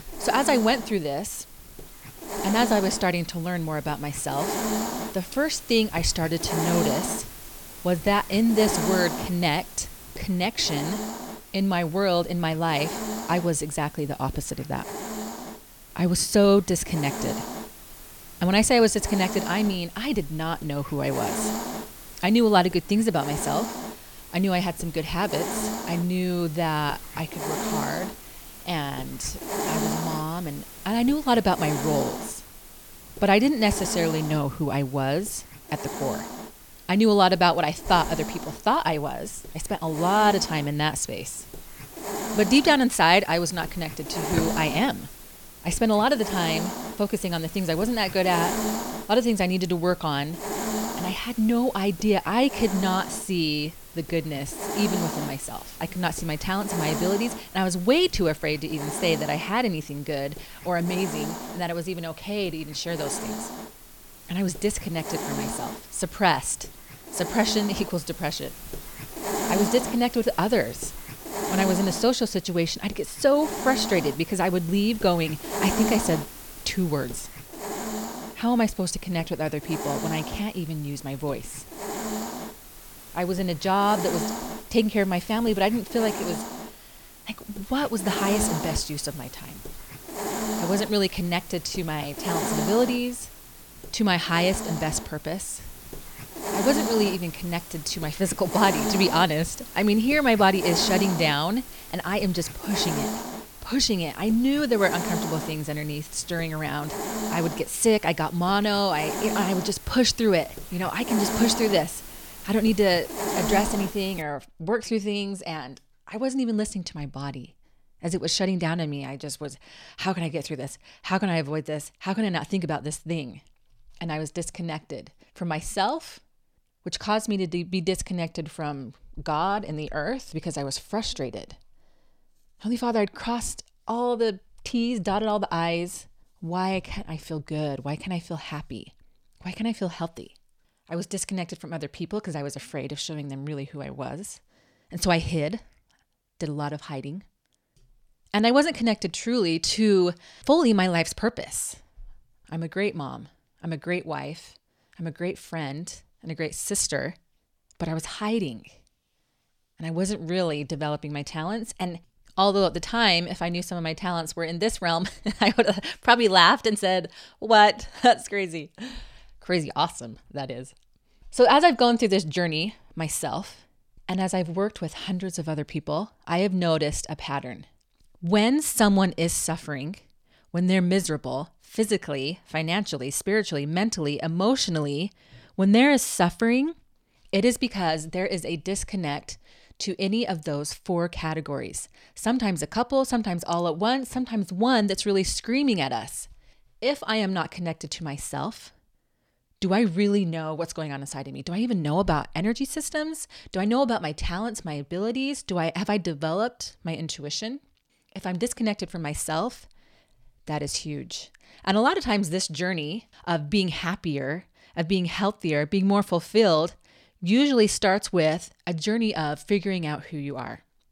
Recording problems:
hiss; loud; until 1:54; 8 dB below the speech

